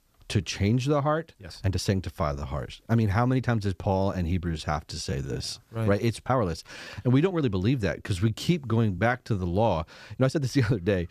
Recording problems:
uneven, jittery; strongly; from 1.5 to 10 s

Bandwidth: 15 kHz